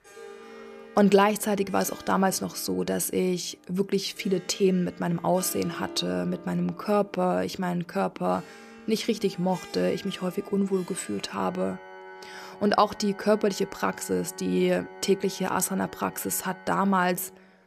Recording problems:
background music; noticeable; throughout; 20 dB below the speech

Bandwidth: 14.5 kHz